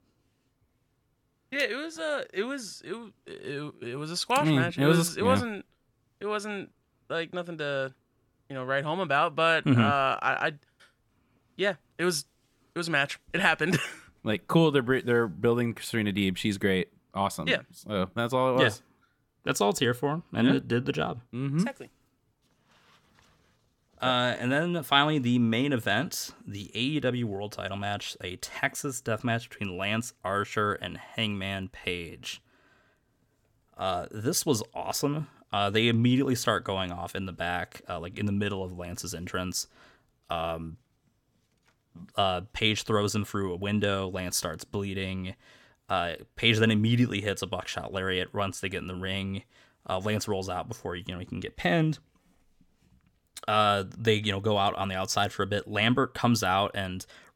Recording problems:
none

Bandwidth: 17 kHz